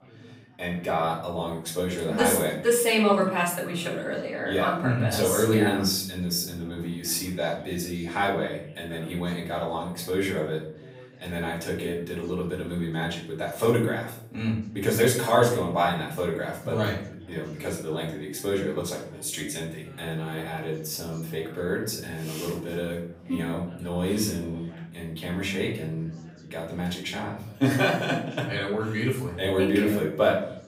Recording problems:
off-mic speech; far
room echo; noticeable; dies away in 0.5 s
background chatter; faint; throughout; 4 voices, 25 dB below the speech

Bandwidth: 15.5 kHz